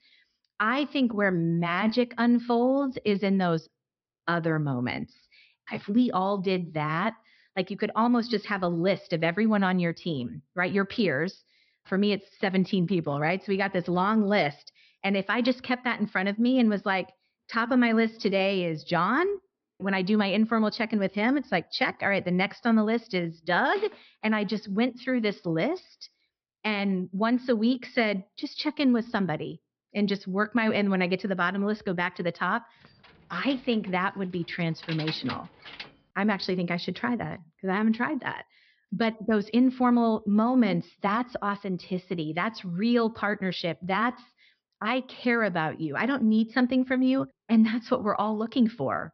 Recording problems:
high frequencies cut off; noticeable; nothing above 5.5 kHz
jangling keys; noticeable; from 33 to 36 s; peak 9 dB below the speech

